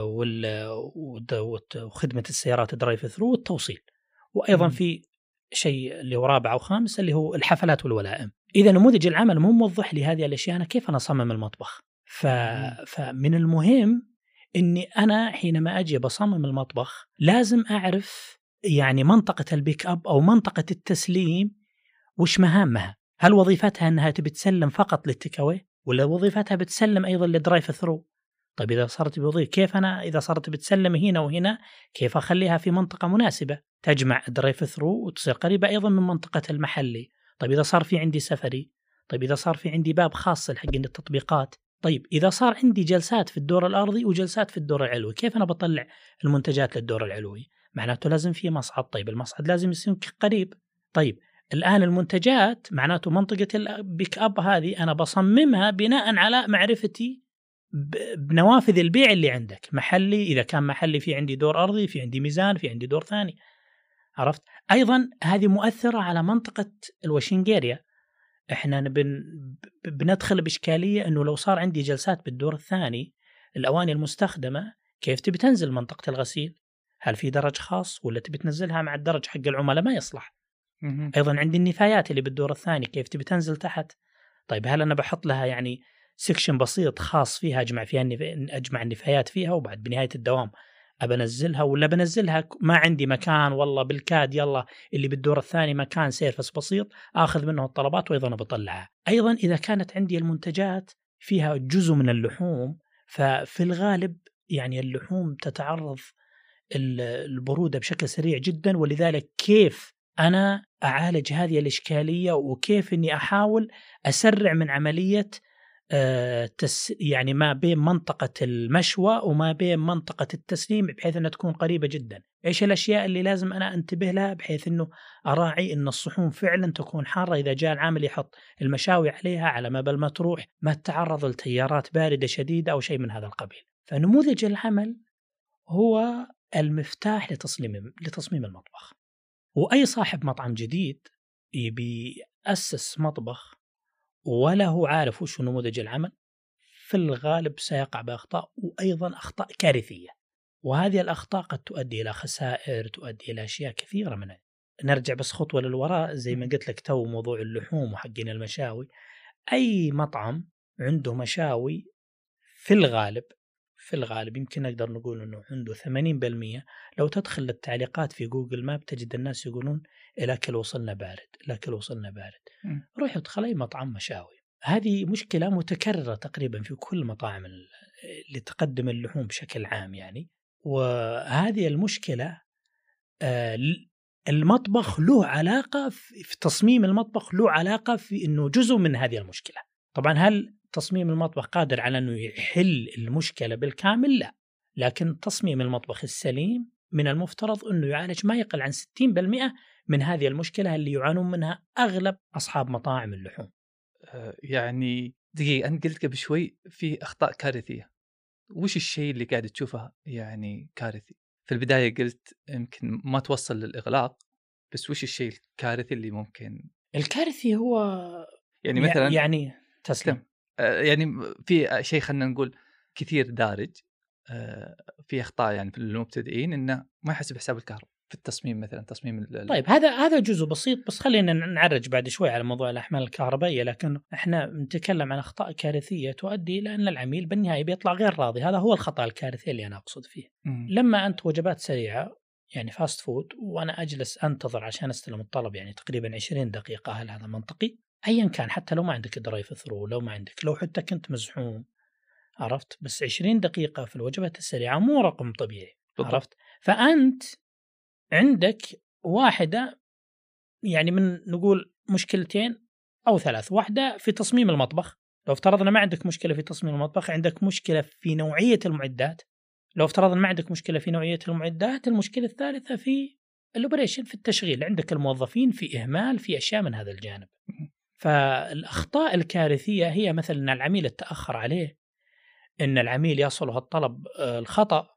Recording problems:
abrupt cut into speech; at the start

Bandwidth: 15 kHz